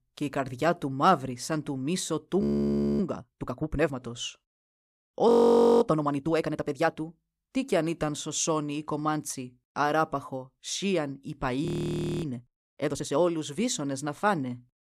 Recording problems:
audio freezing; at 2.5 s for 0.5 s, at 5.5 s for 0.5 s and at 12 s for 0.5 s

